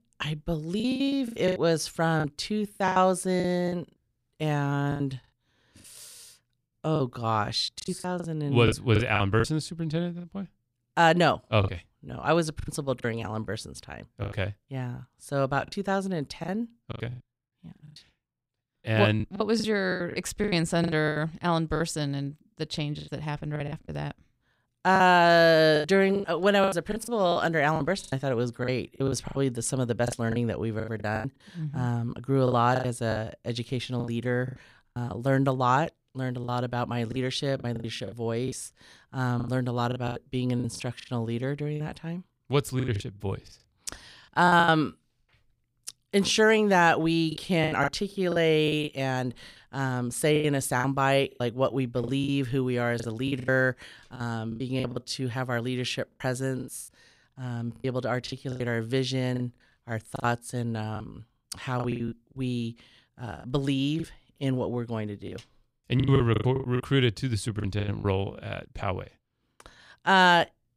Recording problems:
choppy; very; 12% of the speech affected

